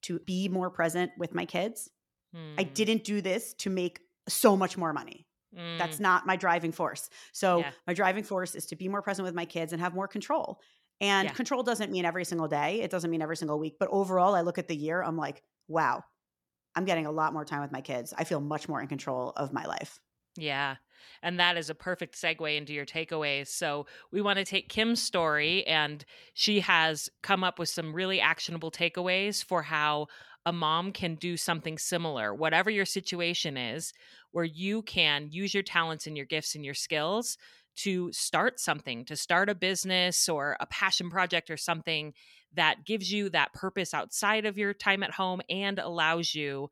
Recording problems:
none

